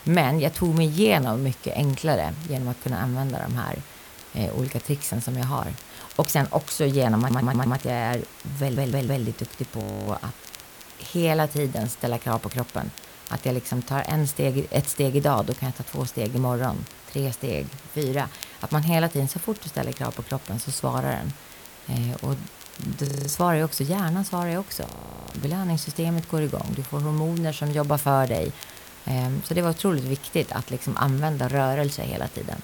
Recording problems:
hiss; noticeable; throughout; 20 dB below the speech
crackle, like an old record; faint; 20 dB below the speech
audio stuttering; at 7 s and at 8.5 s
audio freezing; at 10 s, at 23 s and at 25 s

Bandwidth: 18.5 kHz